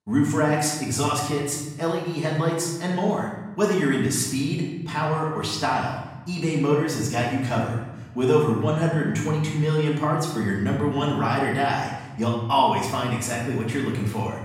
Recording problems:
off-mic speech; far
room echo; noticeable; dies away in 1 s

